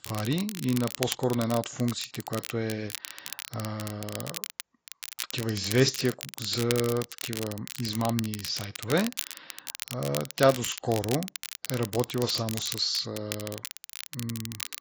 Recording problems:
garbled, watery; badly; nothing above 7.5 kHz
crackle, like an old record; loud; 8 dB below the speech

